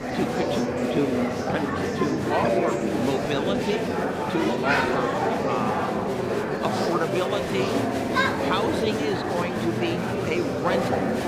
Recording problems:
murmuring crowd; very loud; throughout; 4 dB above the speech

